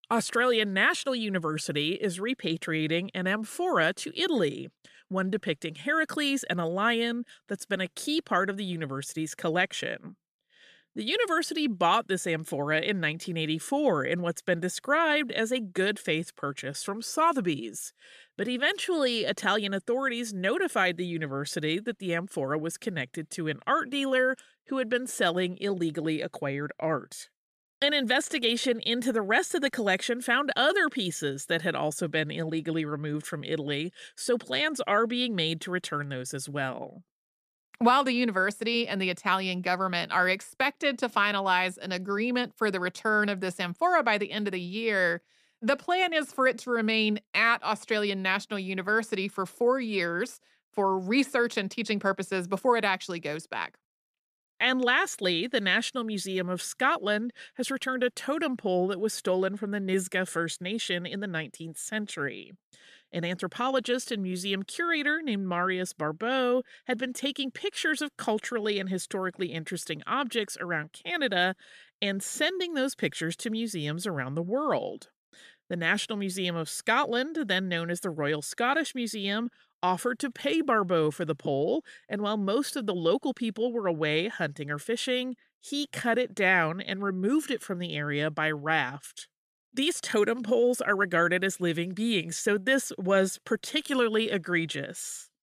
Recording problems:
none

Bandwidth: 14.5 kHz